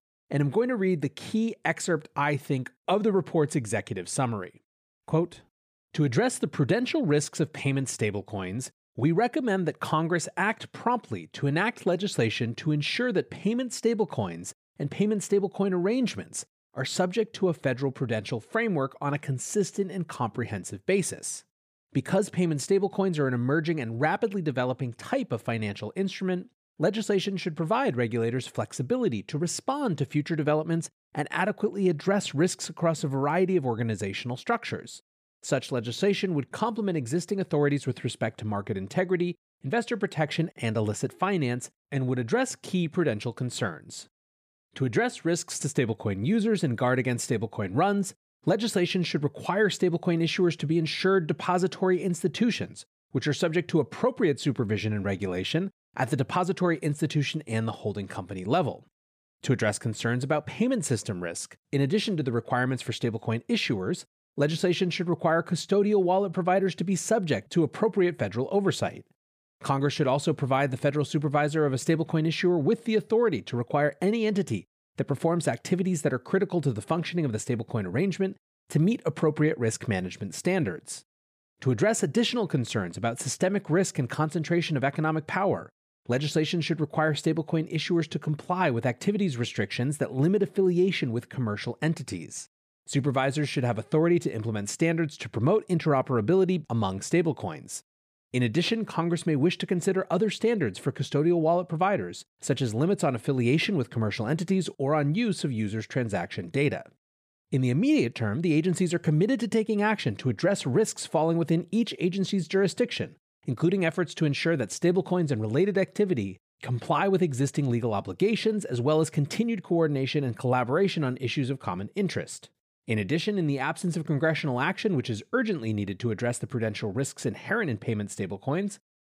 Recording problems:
none

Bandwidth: 15 kHz